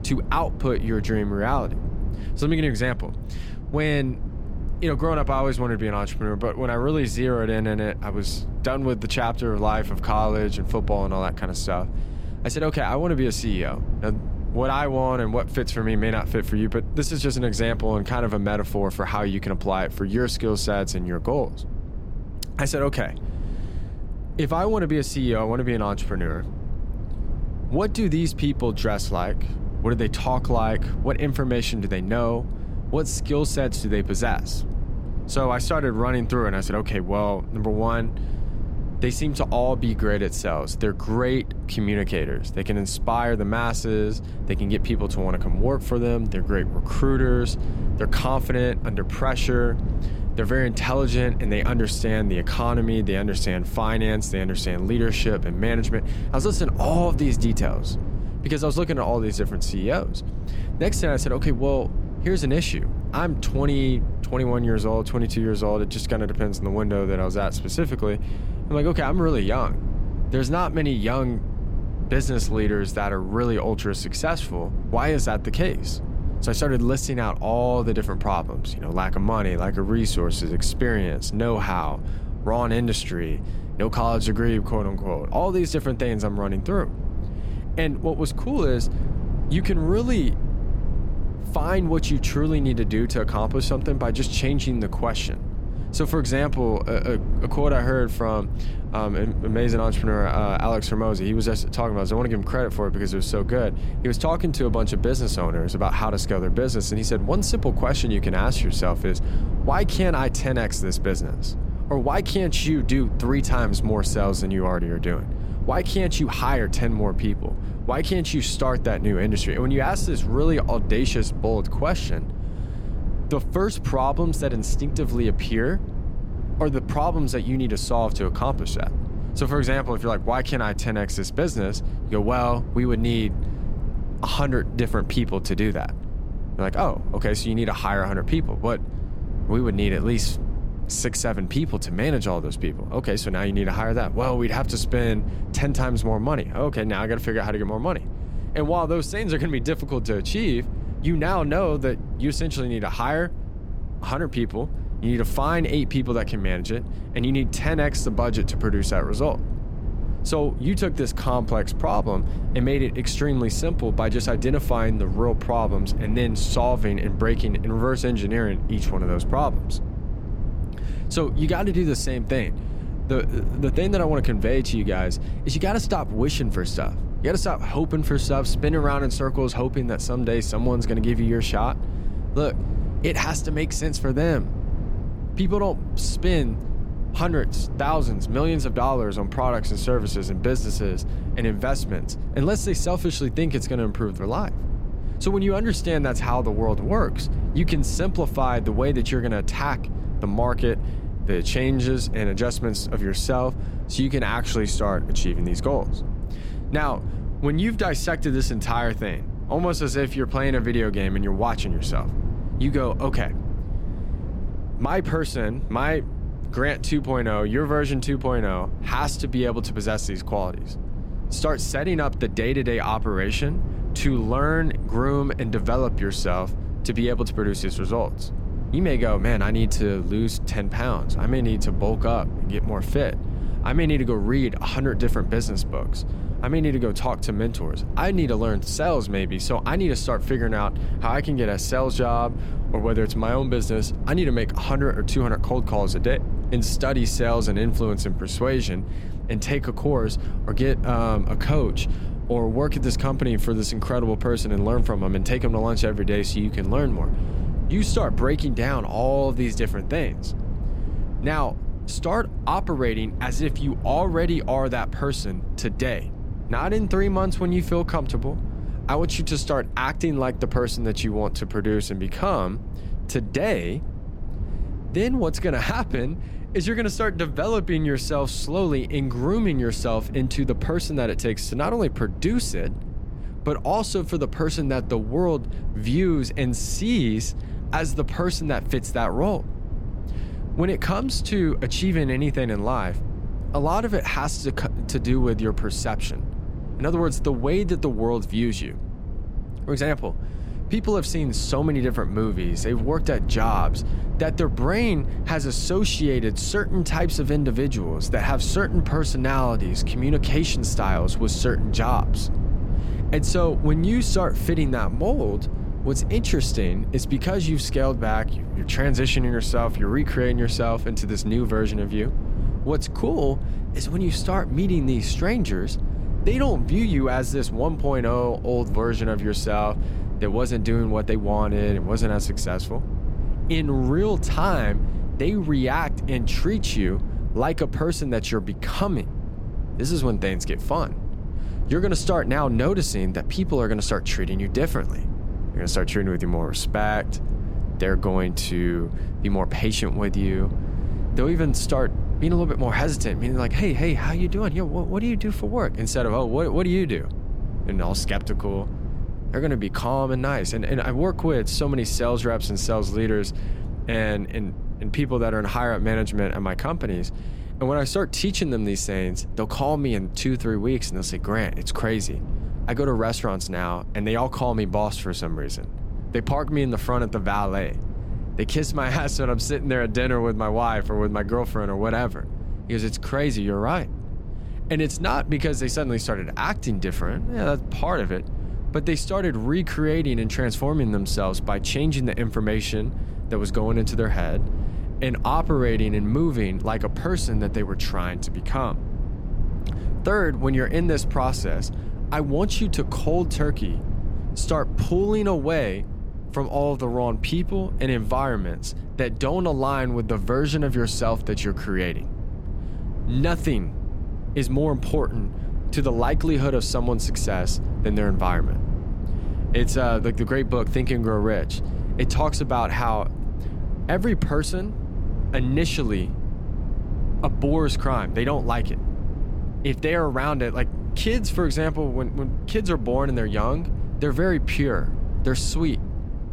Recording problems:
low rumble; noticeable; throughout; 15 dB below the speech

